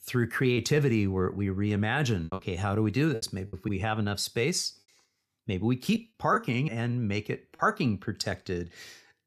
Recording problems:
choppy; very; from 0.5 to 2.5 s and at 3 s; 5% of the speech affected

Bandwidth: 14.5 kHz